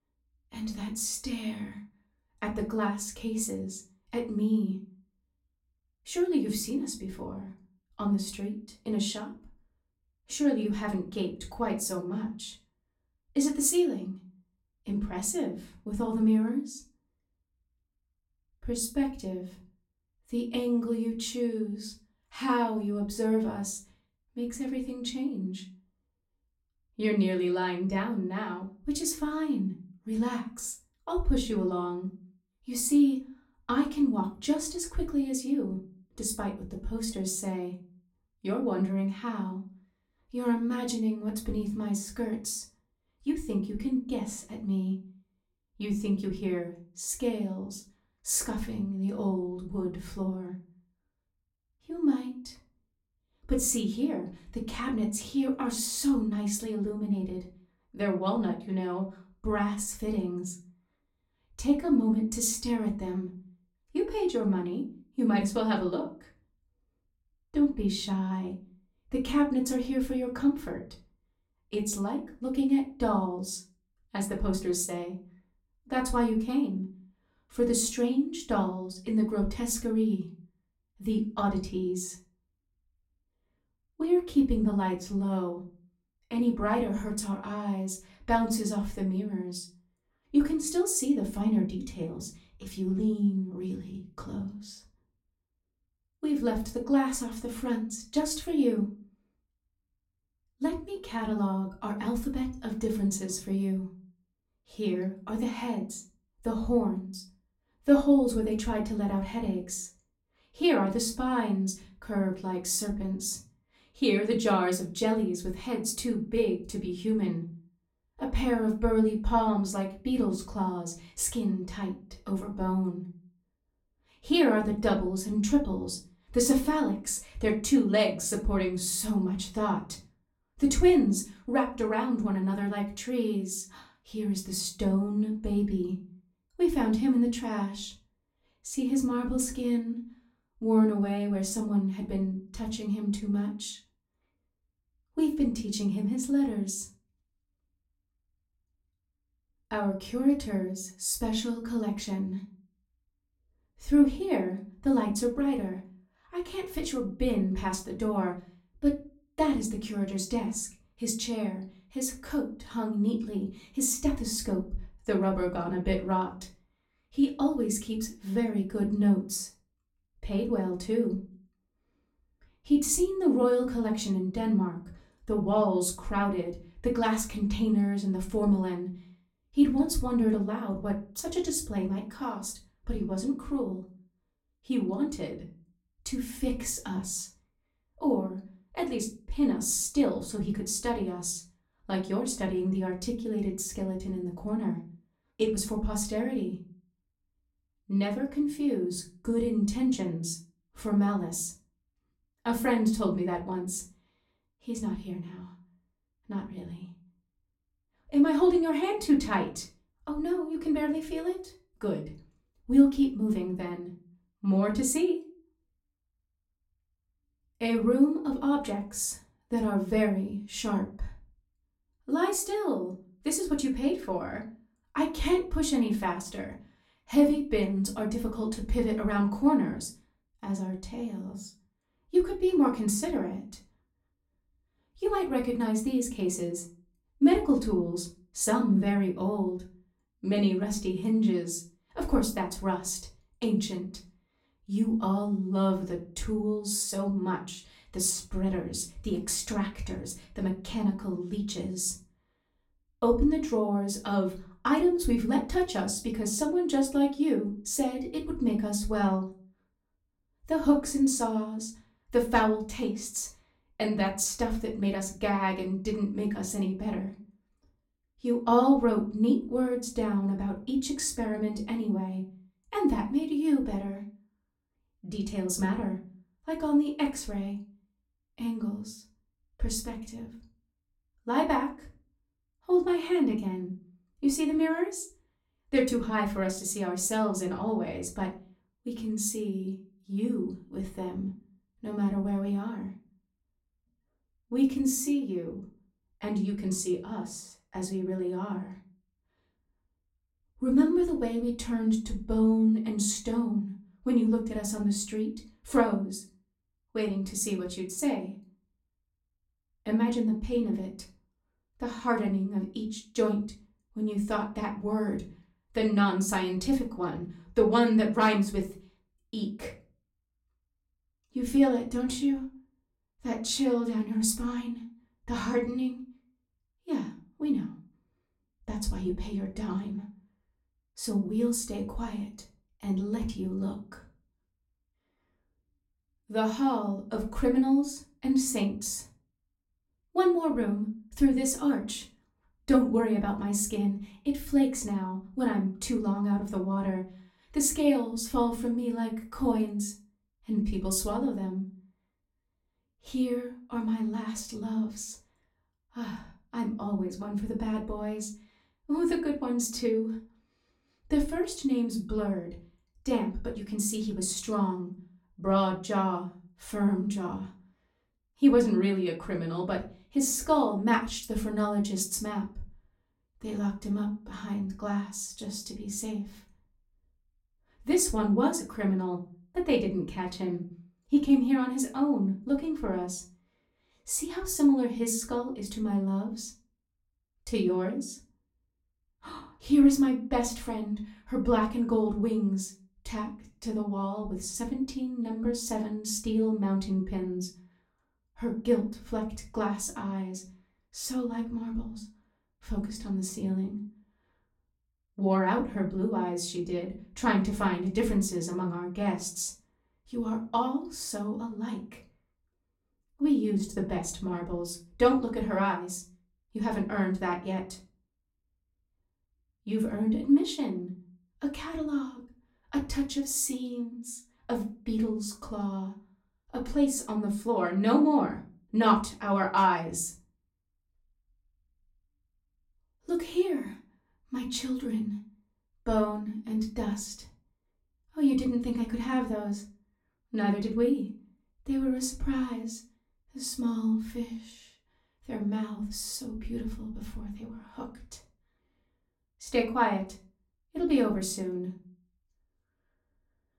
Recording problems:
off-mic speech; far
room echo; very slight; dies away in 0.3 s

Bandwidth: 16.5 kHz